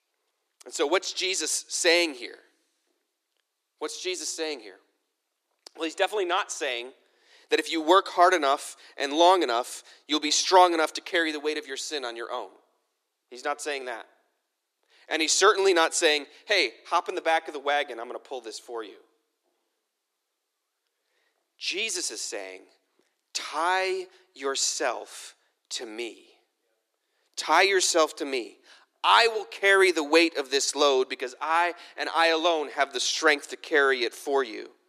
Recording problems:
thin; somewhat; fading below 350 Hz

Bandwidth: 14.5 kHz